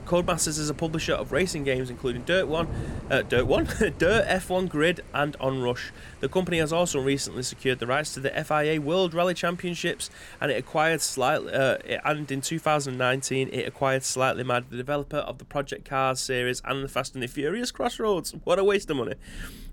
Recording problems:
rain or running water; noticeable; throughout; 15 dB below the speech

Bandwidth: 17 kHz